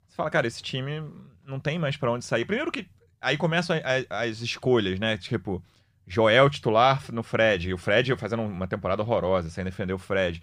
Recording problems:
none

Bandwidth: 15 kHz